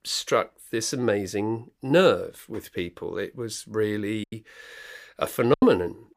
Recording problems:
choppy; occasionally; 3% of the speech affected

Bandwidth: 15 kHz